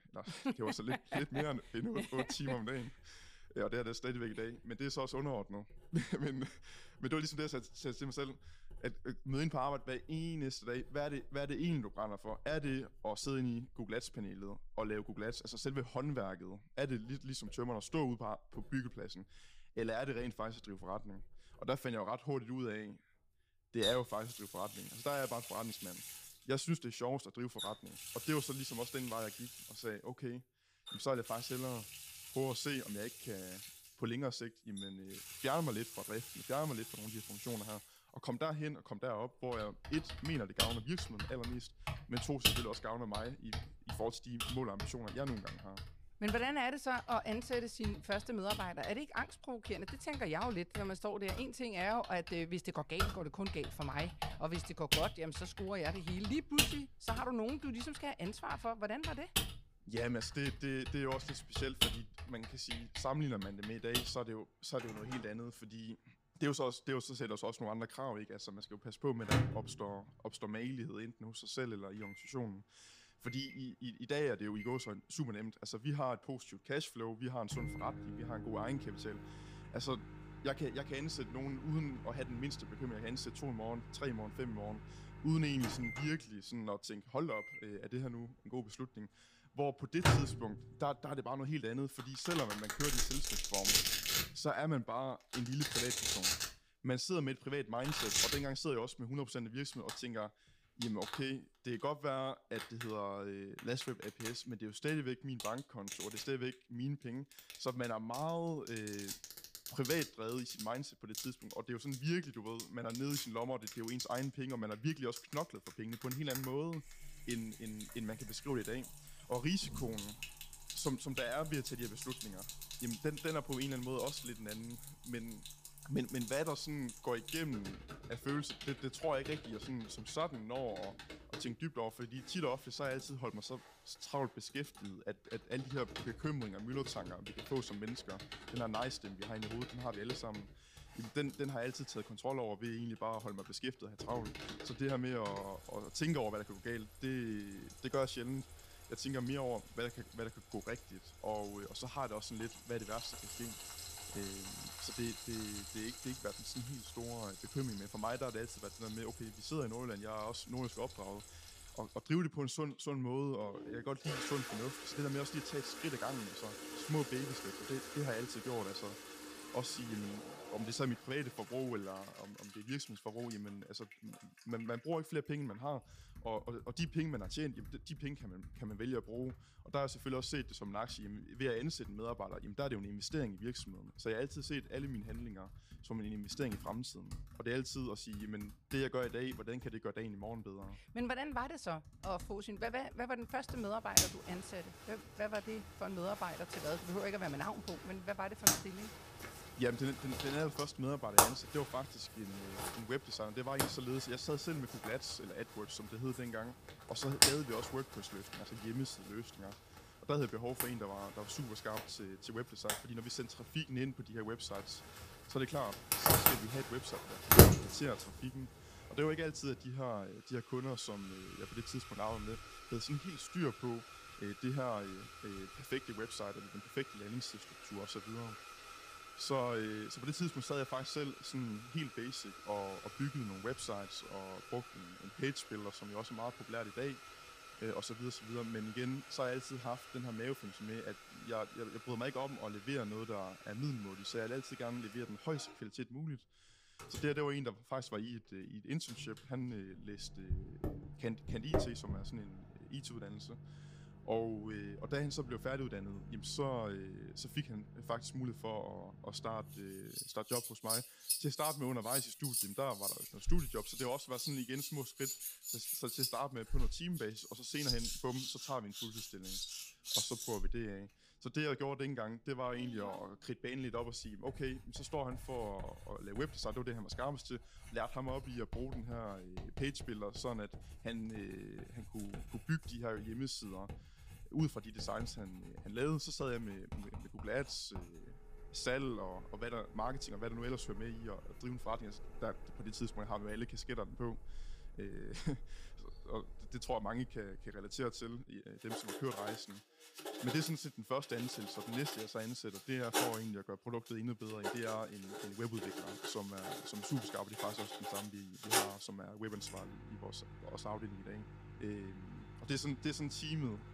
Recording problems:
household noises; very loud; throughout; as loud as the speech

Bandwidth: 15 kHz